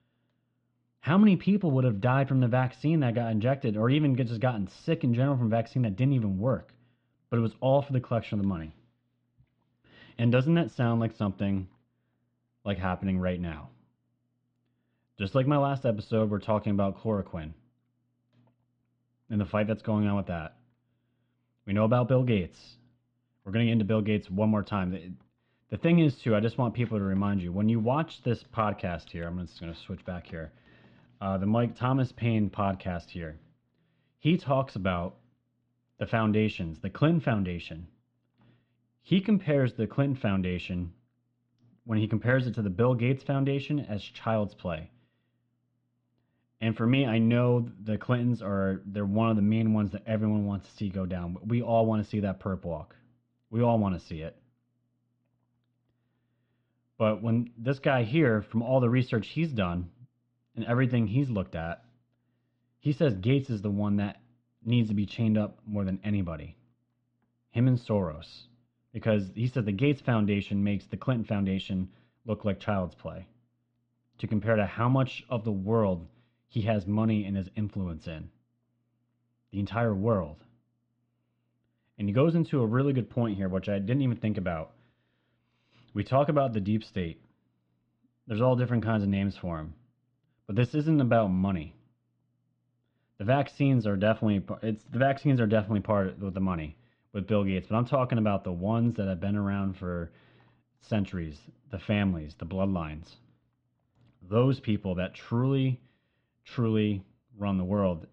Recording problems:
muffled; very; fading above 3.5 kHz

